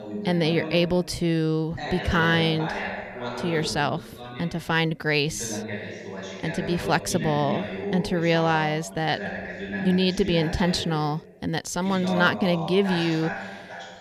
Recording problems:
voice in the background; loud; throughout; 8 dB below the speech

